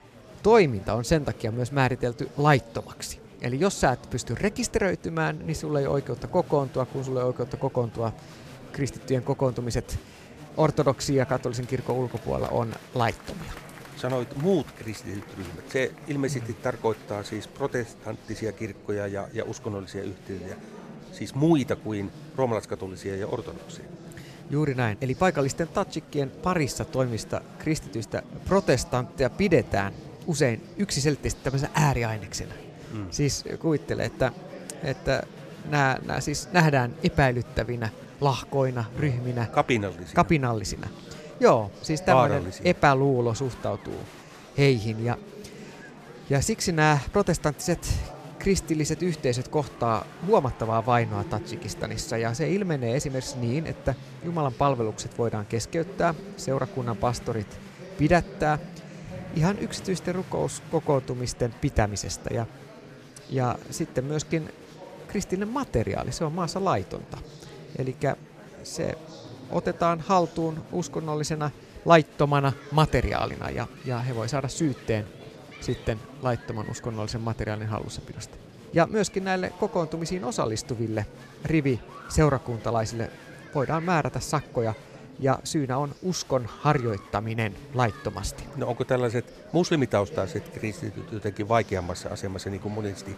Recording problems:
murmuring crowd; noticeable; throughout; 15 dB below the speech

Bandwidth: 14.5 kHz